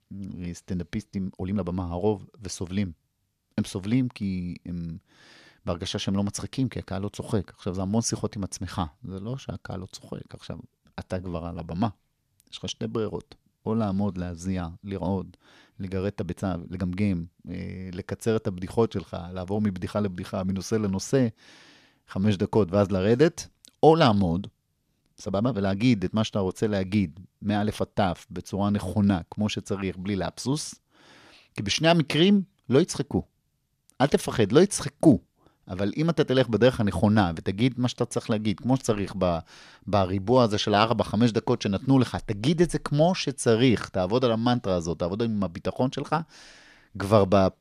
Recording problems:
uneven, jittery; strongly; from 1 to 41 s

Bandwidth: 14 kHz